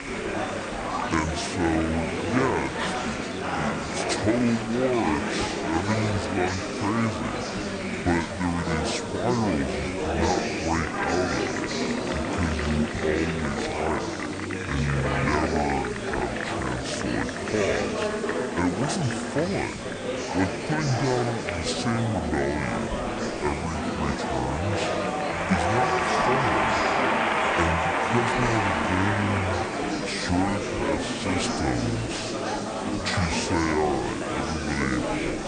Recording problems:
wrong speed and pitch; too slow and too low; 0.6 times normal speed
murmuring crowd; very loud; throughout; 1 dB above the speech
hiss; noticeable; throughout; 15 dB below the speech

